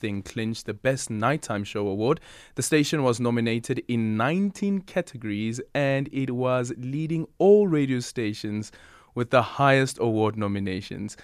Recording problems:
none

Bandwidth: 14.5 kHz